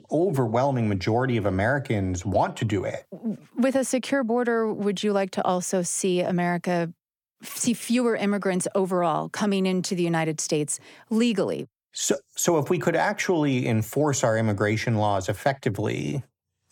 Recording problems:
none

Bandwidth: 18 kHz